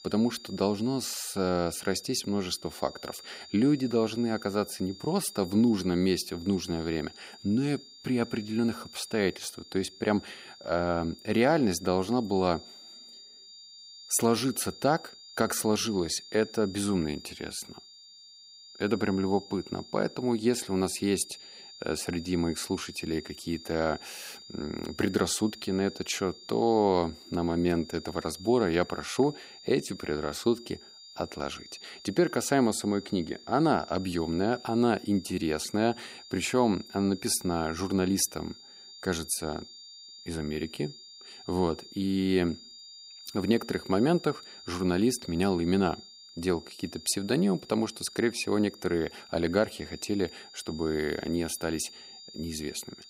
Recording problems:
high-pitched whine; noticeable; throughout; 4.5 kHz, 20 dB below the speech

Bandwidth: 15.5 kHz